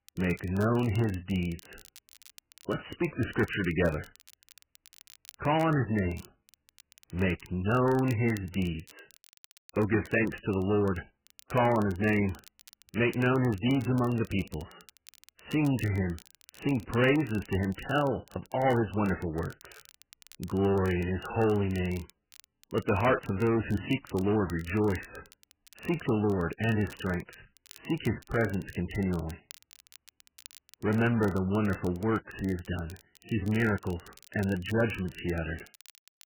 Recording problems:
garbled, watery; badly; nothing above 3 kHz
distortion; slight; 10 dB below the speech
crackle, like an old record; faint; 25 dB below the speech

